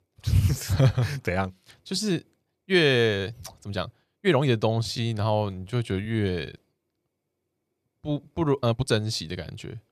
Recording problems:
uneven, jittery; strongly; from 1 to 9 s

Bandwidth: 14.5 kHz